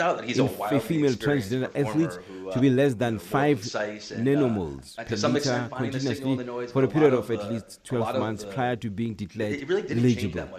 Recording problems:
voice in the background; loud; throughout; 5 dB below the speech

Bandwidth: 14 kHz